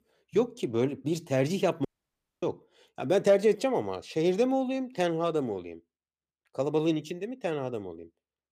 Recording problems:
audio cutting out; at 2 s for 0.5 s

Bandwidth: 15 kHz